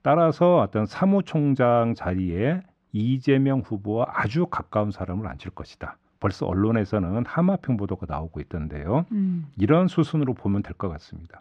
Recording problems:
muffled; slightly; fading above 3 kHz

